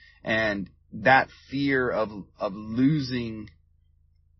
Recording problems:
garbled, watery; slightly; nothing above 5.5 kHz

